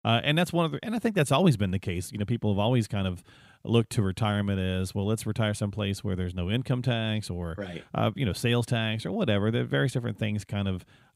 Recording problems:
none

